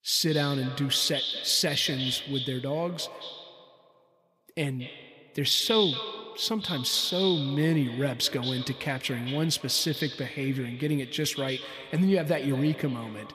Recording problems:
echo of what is said; strong; throughout; 220 ms later, 7 dB below the speech

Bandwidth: 15 kHz